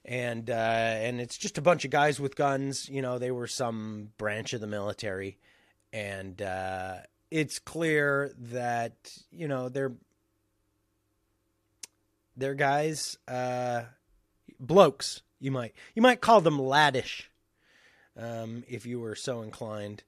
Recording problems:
none

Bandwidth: 14.5 kHz